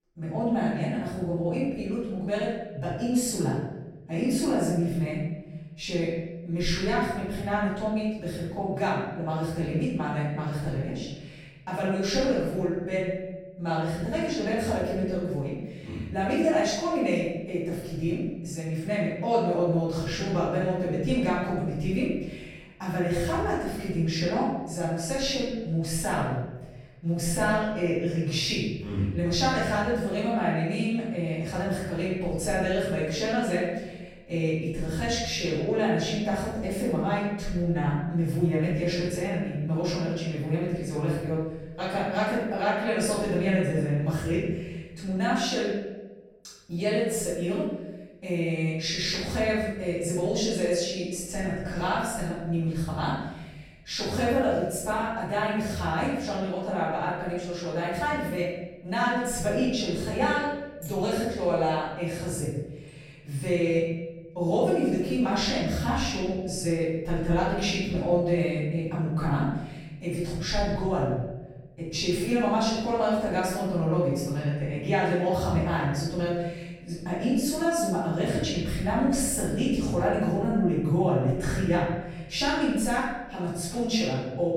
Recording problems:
room echo; strong; dies away in 1 s
off-mic speech; far

